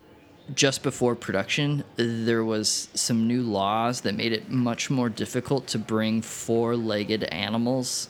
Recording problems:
murmuring crowd; faint; throughout; 25 dB below the speech

